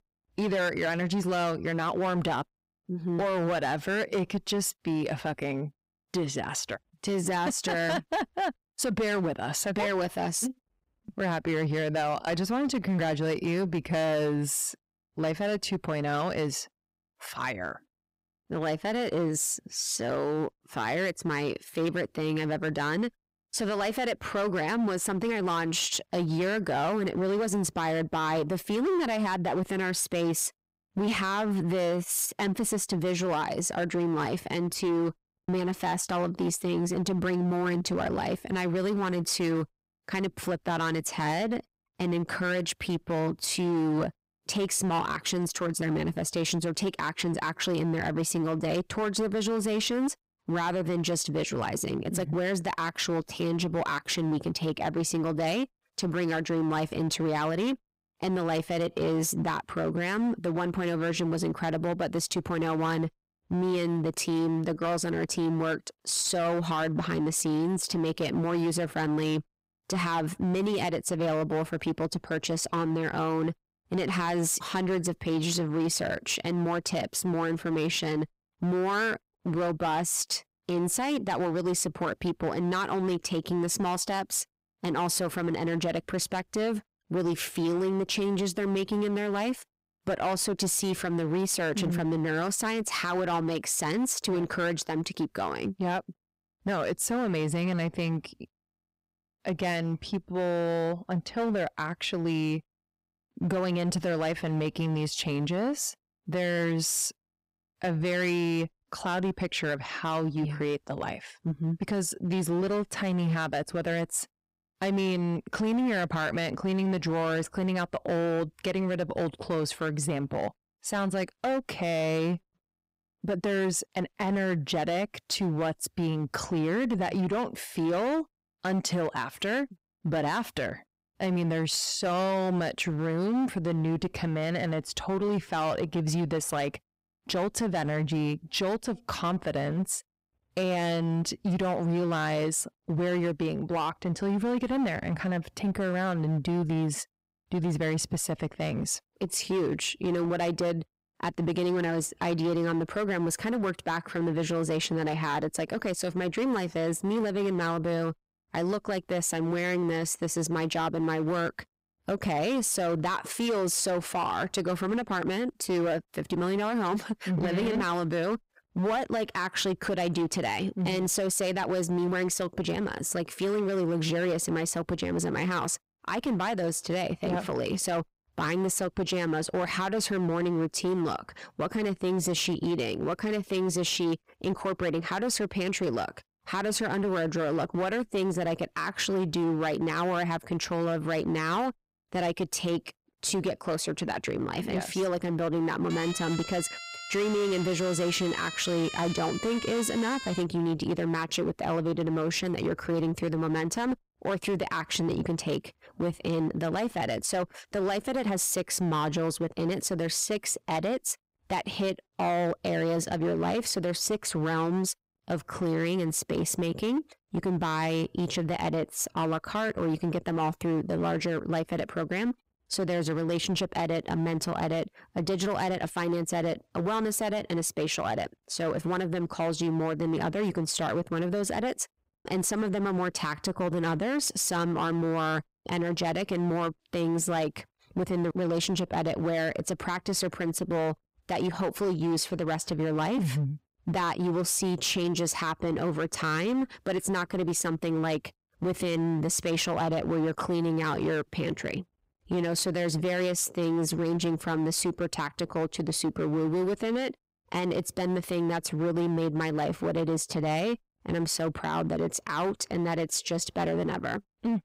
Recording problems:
distortion; slight; 13% of the sound clipped
siren; noticeable; from 3:16 to 3:20; peak 7 dB below the speech

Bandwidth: 15.5 kHz